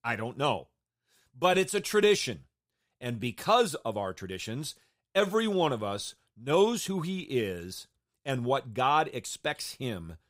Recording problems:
uneven, jittery; slightly; from 1.5 to 9.5 s

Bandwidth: 15.5 kHz